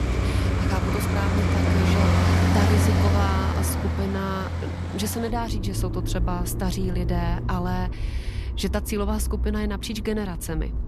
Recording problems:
traffic noise; very loud; throughout; 5 dB above the speech

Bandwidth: 13.5 kHz